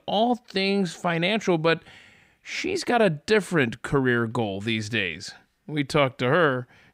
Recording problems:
none

